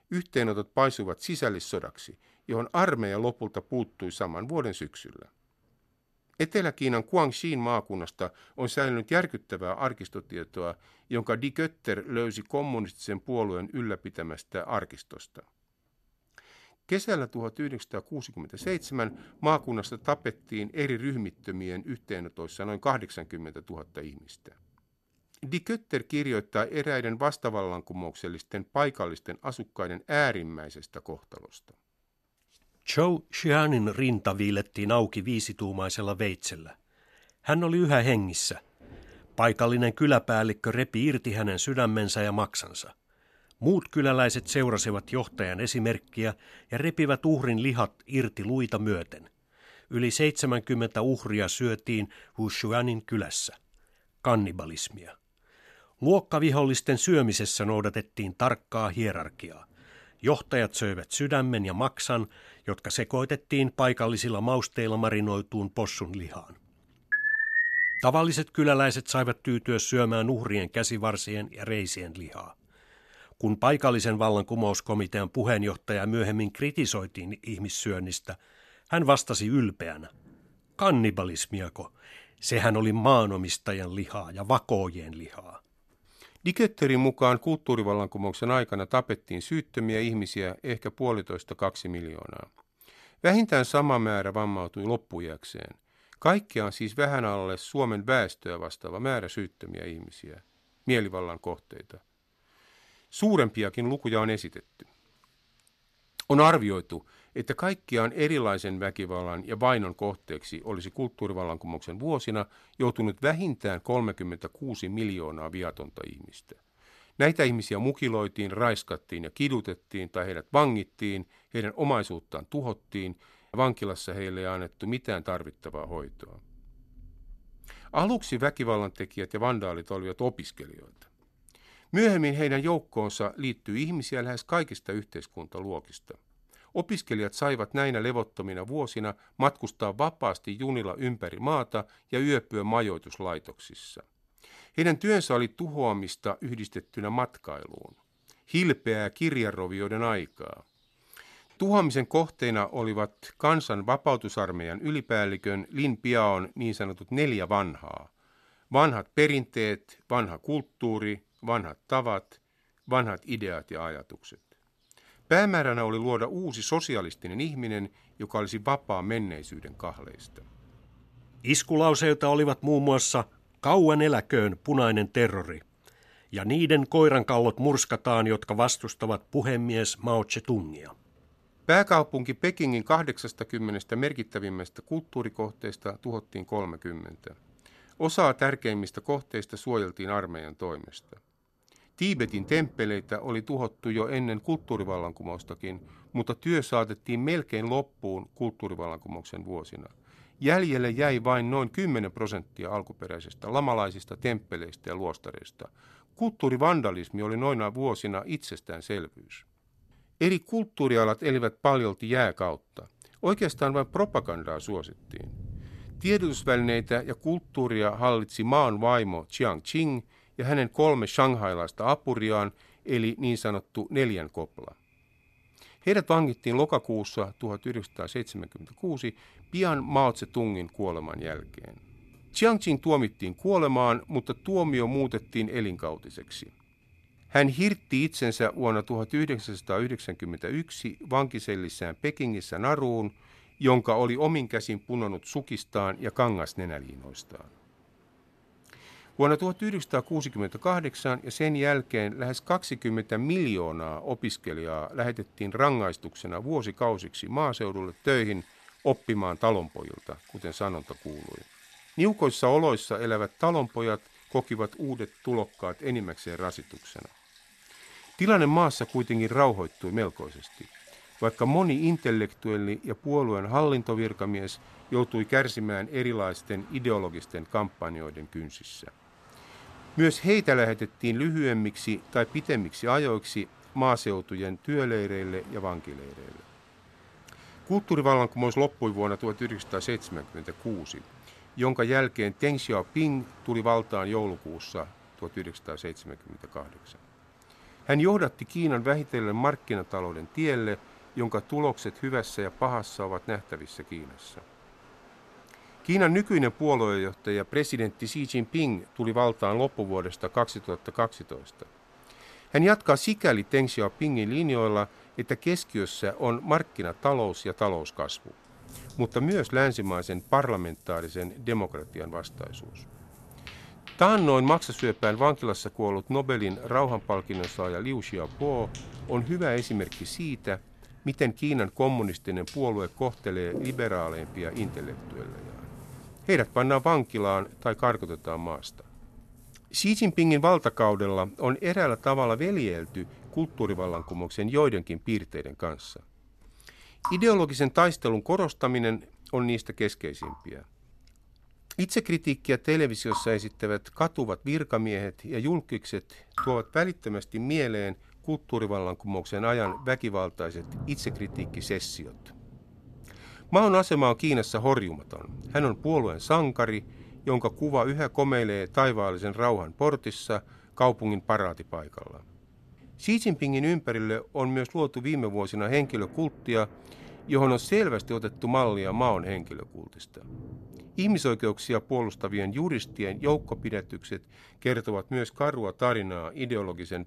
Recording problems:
rain or running water; faint; throughout; 20 dB below the speech
alarm; loud; at 1:07; peak 5 dB above the speech

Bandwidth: 13.5 kHz